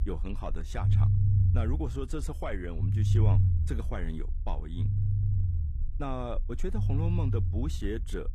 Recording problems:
low rumble; loud; throughout; 2 dB below the speech

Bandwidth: 14.5 kHz